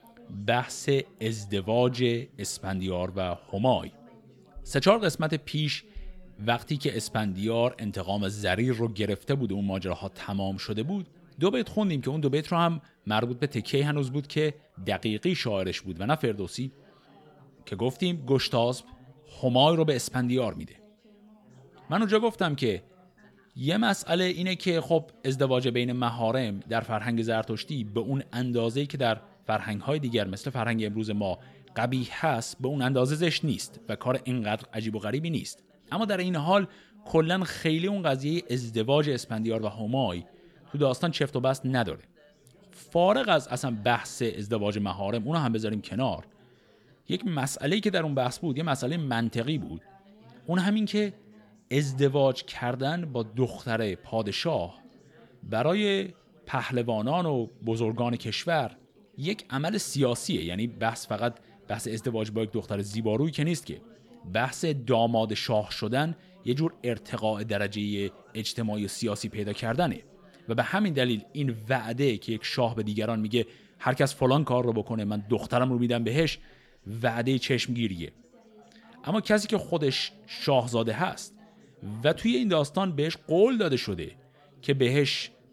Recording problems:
background chatter; faint; throughout; 4 voices, 30 dB below the speech

